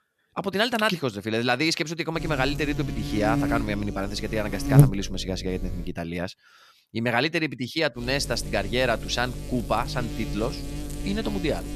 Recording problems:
electrical hum; loud; from 2 to 6 s and from 8 s on; 50 Hz, 8 dB below the speech

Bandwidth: 14 kHz